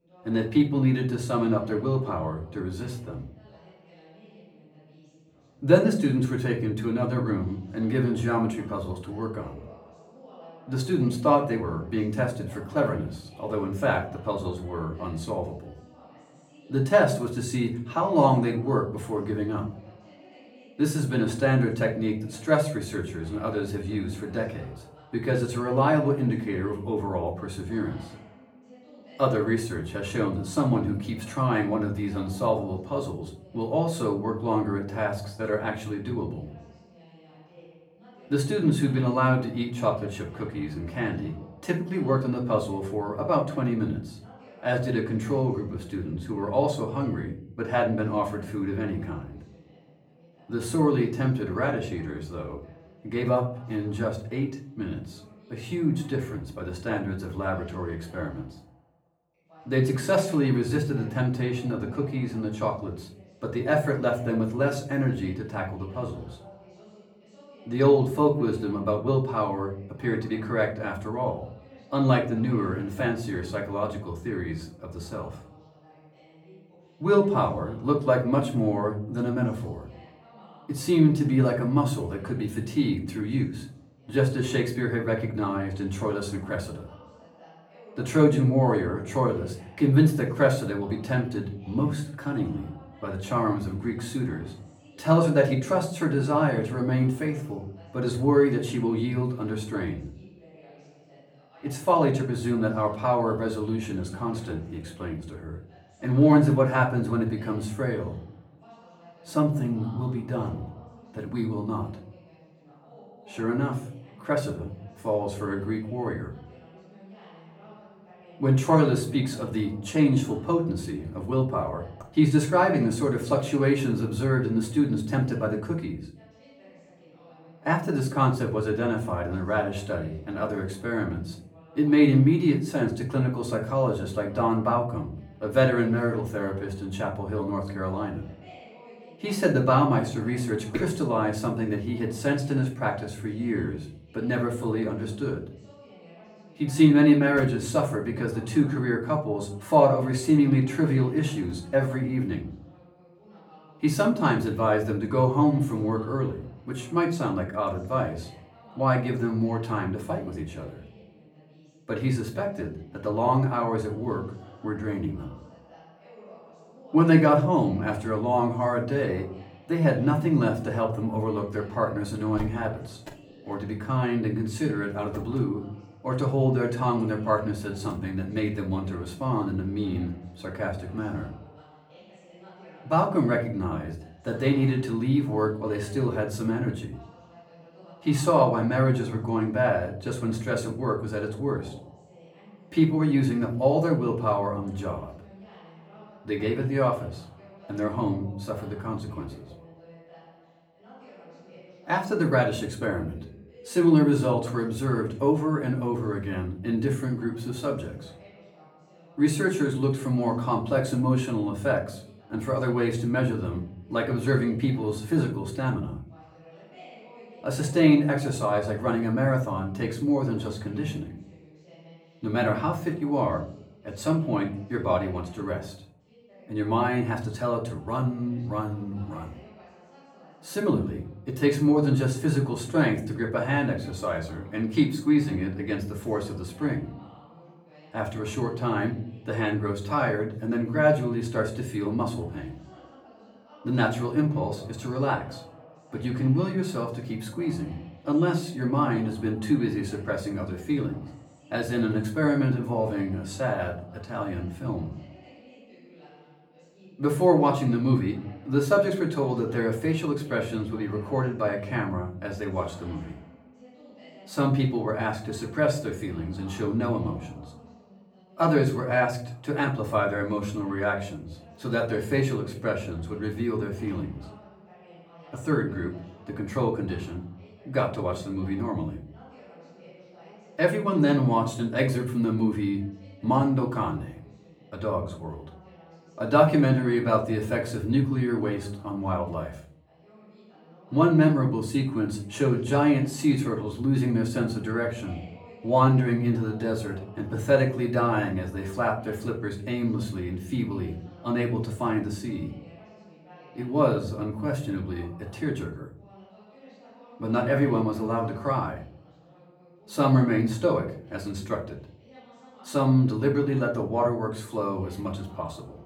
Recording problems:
off-mic speech; far
room echo; slight; dies away in 0.5 s
voice in the background; faint; throughout; 25 dB below the speech

